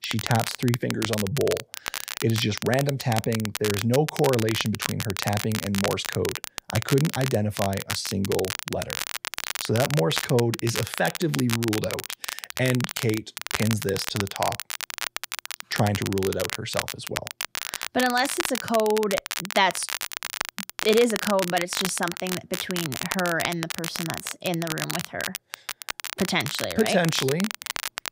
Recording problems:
crackle, like an old record; loud; 5 dB below the speech

